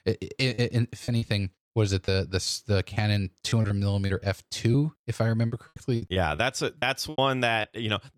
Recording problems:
choppy; very; 11% of the speech affected

